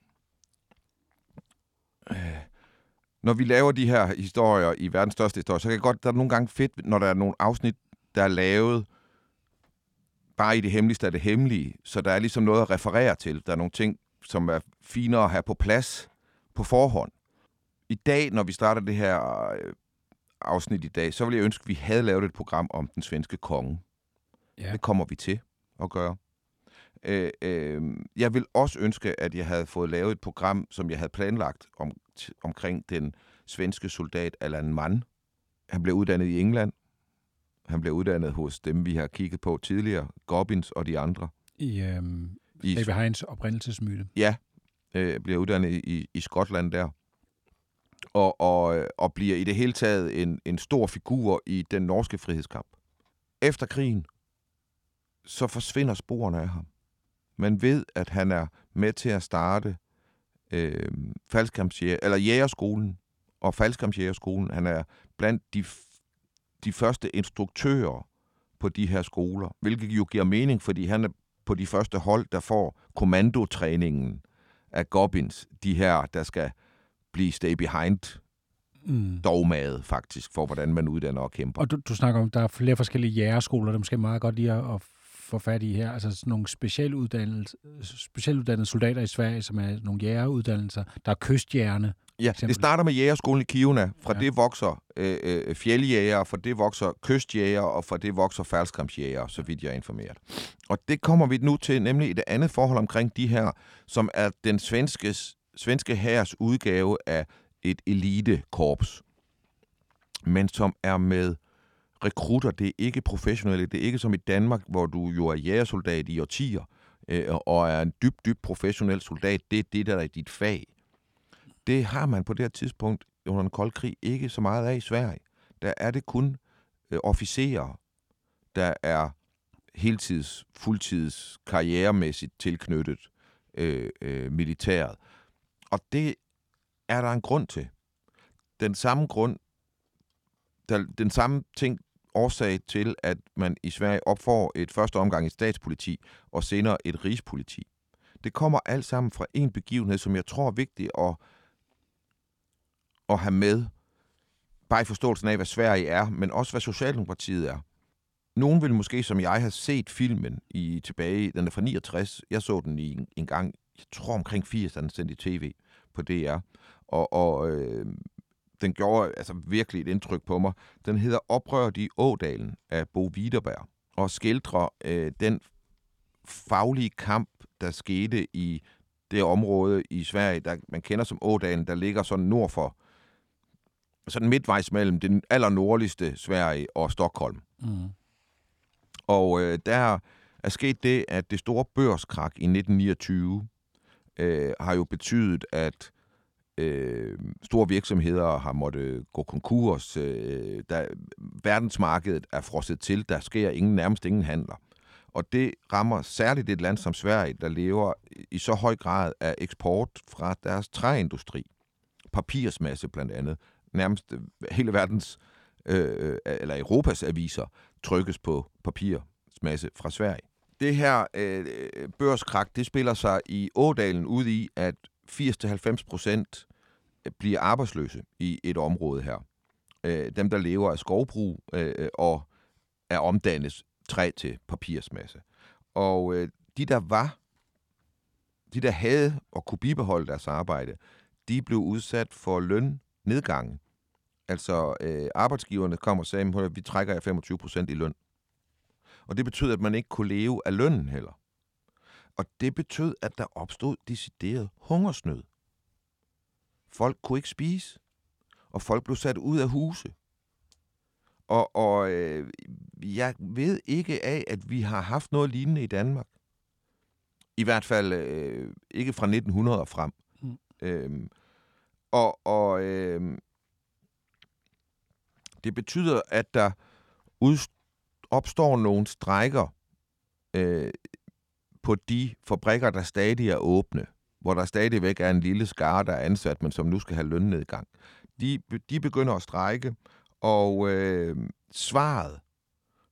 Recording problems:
none

